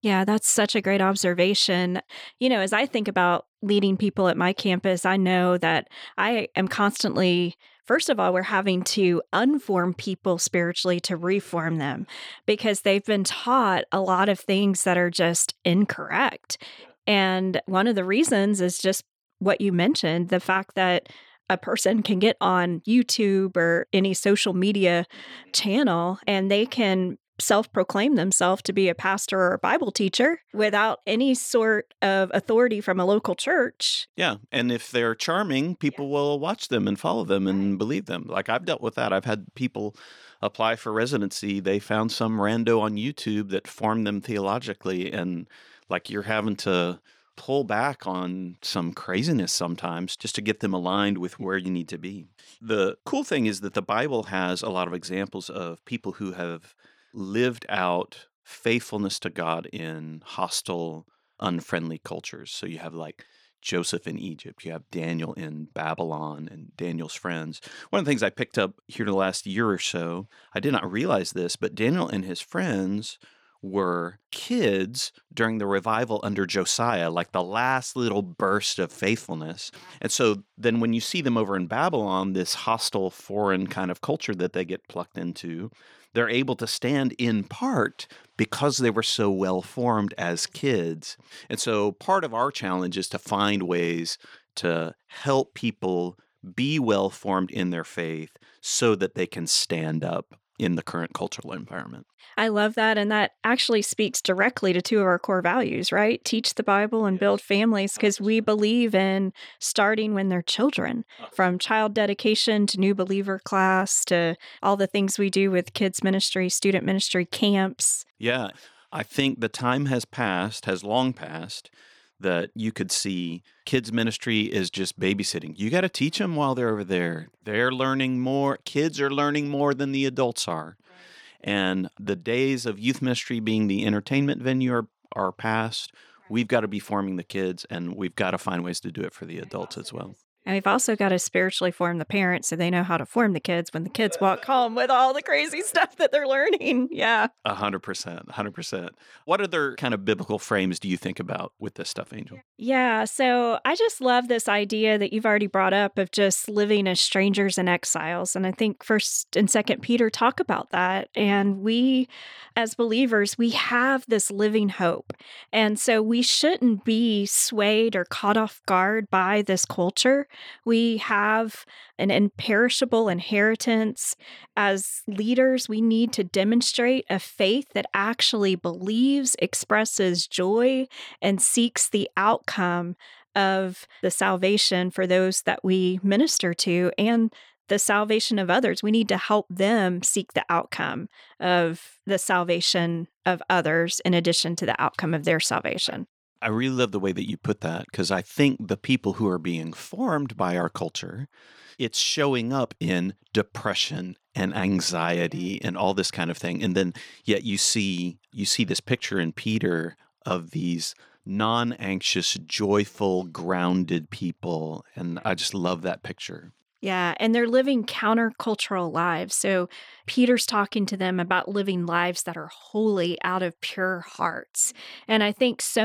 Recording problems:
abrupt cut into speech; at the end

